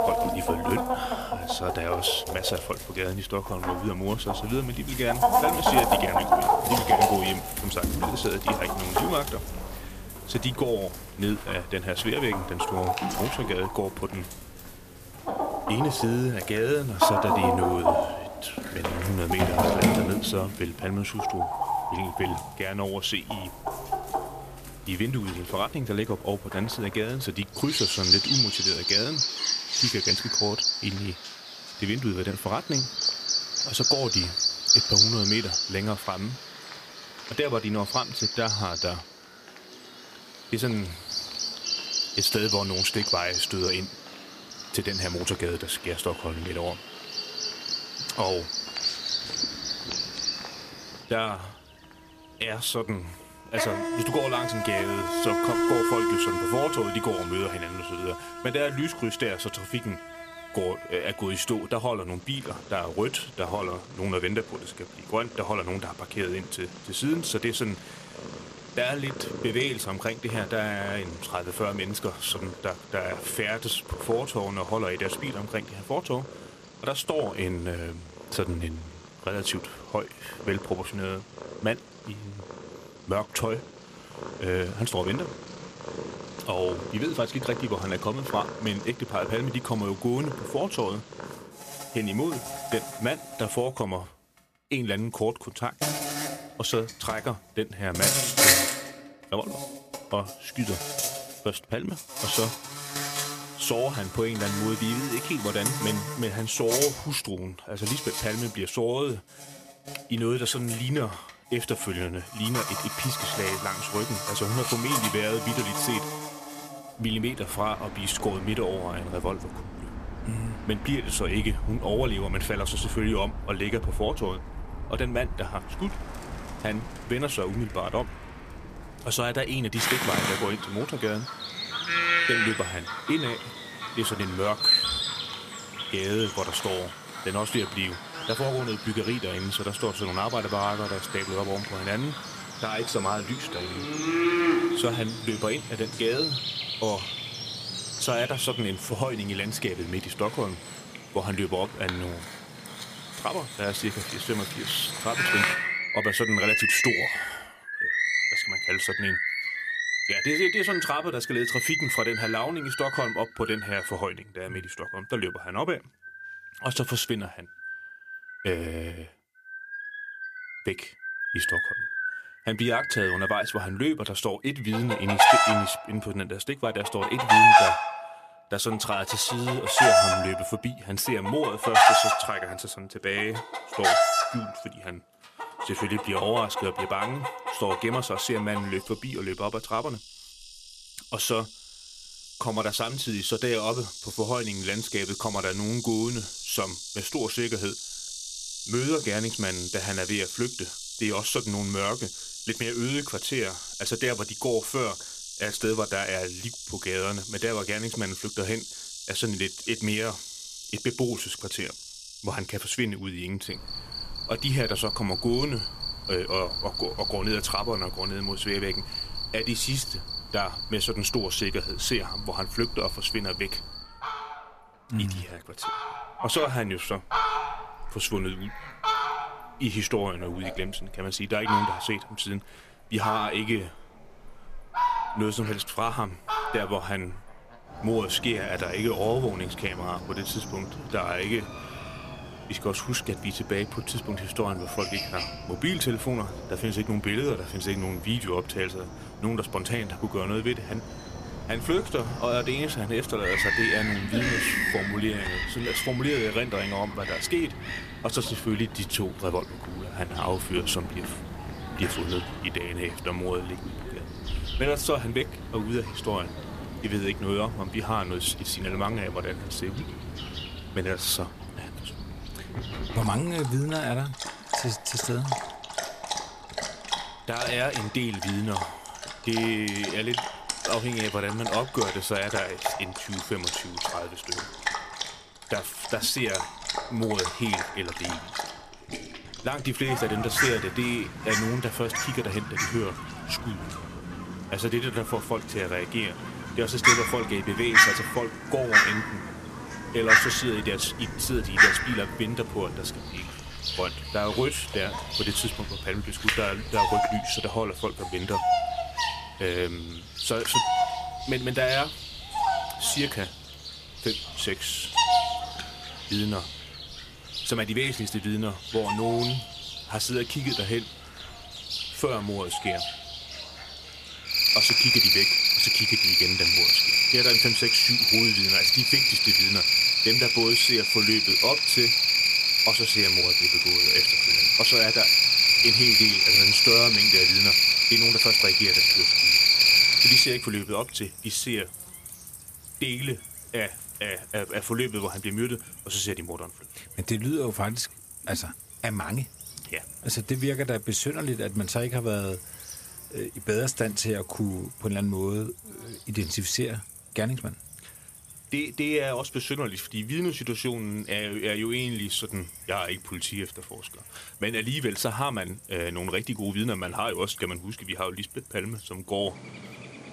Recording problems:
animal sounds; very loud; throughout; 5 dB above the speech

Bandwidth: 14.5 kHz